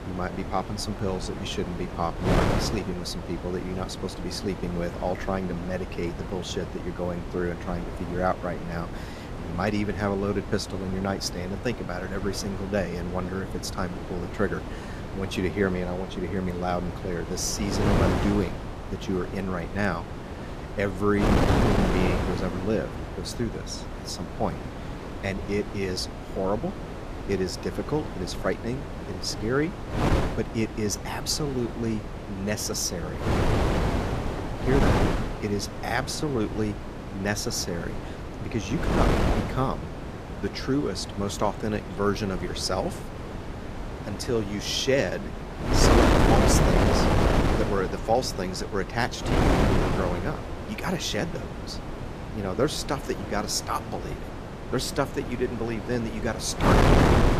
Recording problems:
wind noise on the microphone; heavy; 2 dB below the speech

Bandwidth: 14.5 kHz